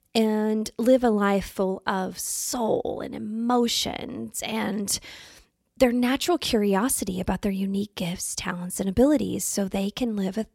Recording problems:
none

